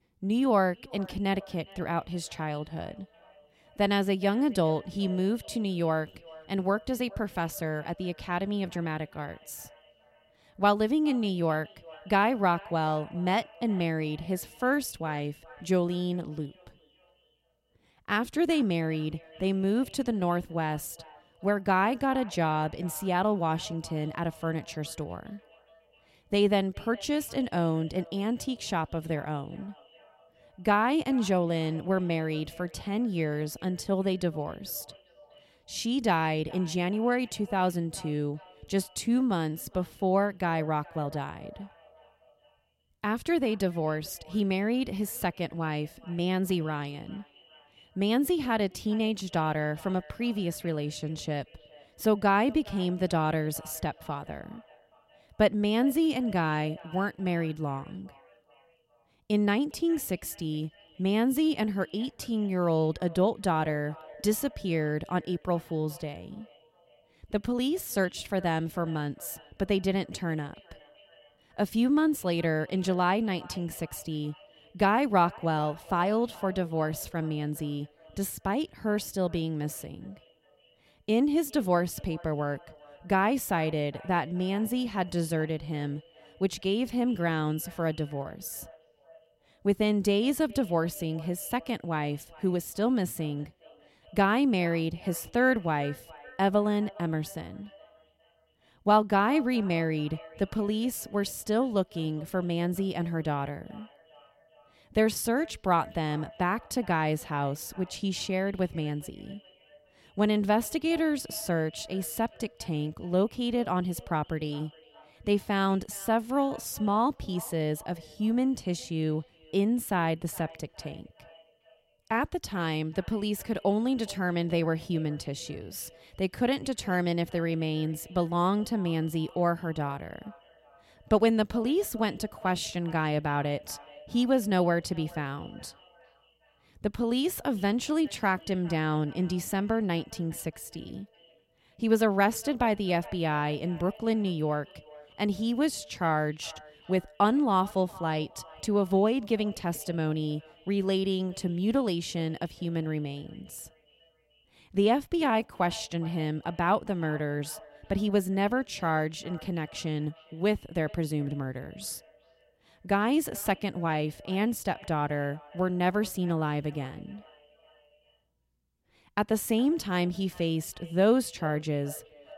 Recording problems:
echo of what is said; faint; throughout; 410 ms later, 25 dB below the speech

